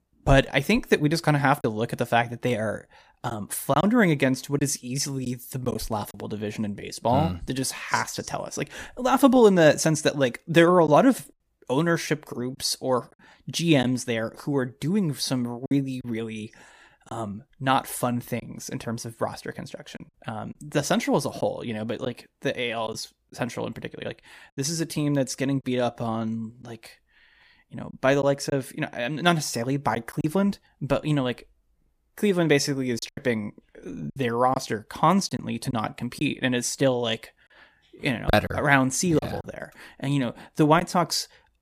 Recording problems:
choppy; occasionally; 3% of the speech affected

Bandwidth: 15 kHz